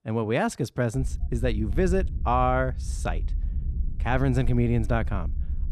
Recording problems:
low rumble; faint; from 1 s on; 20 dB below the speech

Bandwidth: 13.5 kHz